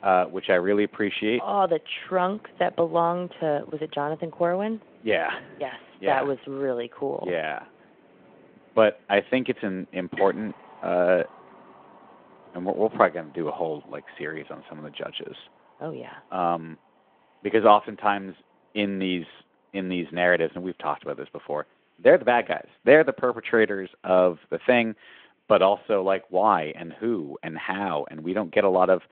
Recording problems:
phone-call audio
wind in the background; faint; throughout; 25 dB below the speech

